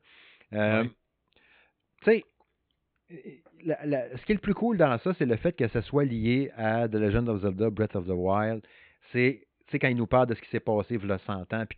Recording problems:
high frequencies cut off; severe; nothing above 4 kHz

